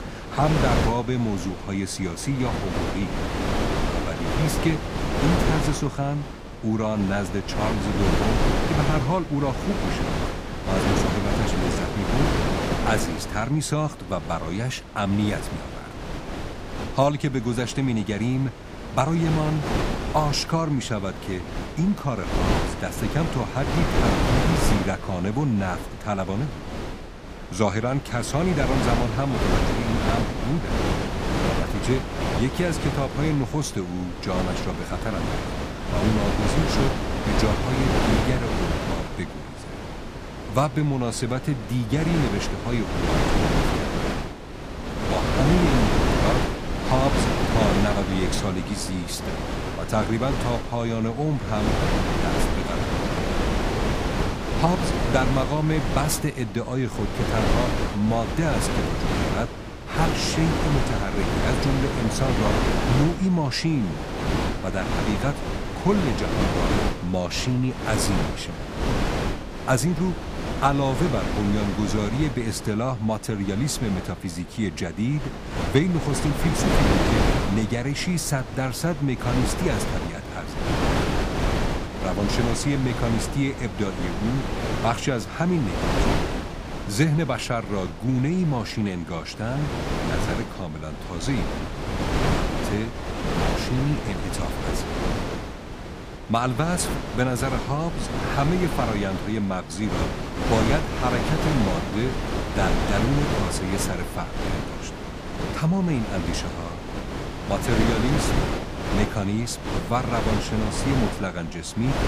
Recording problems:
wind noise on the microphone; heavy; as loud as the speech

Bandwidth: 15 kHz